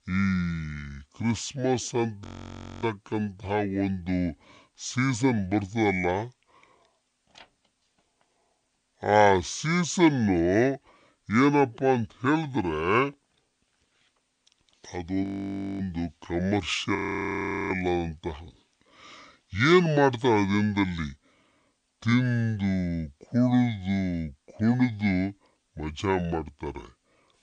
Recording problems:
wrong speed and pitch; too slow and too low; 0.6 times normal speed
audio freezing; at 2 s for 0.5 s, at 15 s for 0.5 s and at 17 s for 1 s

